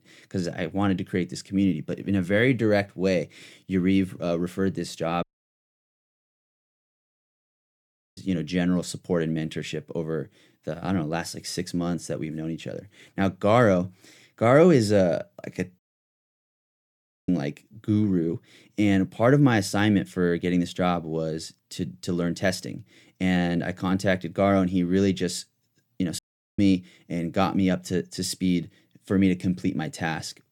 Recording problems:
audio cutting out; at 5 s for 3 s, at 16 s for 1.5 s and at 26 s

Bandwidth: 17.5 kHz